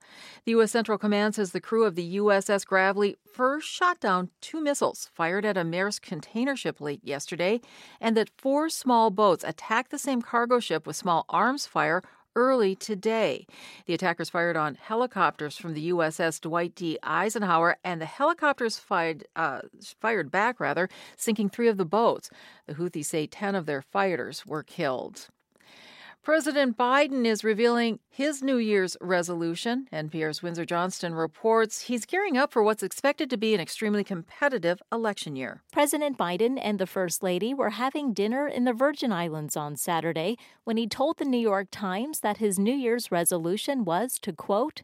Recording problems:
uneven, jittery; strongly; from 1.5 to 35 s

